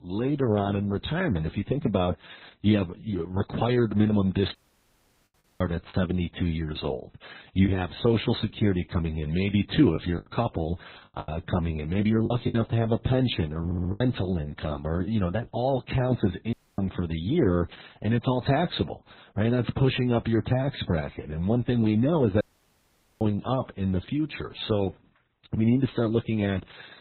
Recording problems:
garbled, watery; badly; nothing above 4 kHz
audio cutting out; at 4.5 s for 1 s, at 17 s and at 22 s for 1 s
choppy; very; from 6 to 7.5 s and from 10 to 14 s; 7% of the speech affected
audio stuttering; at 14 s

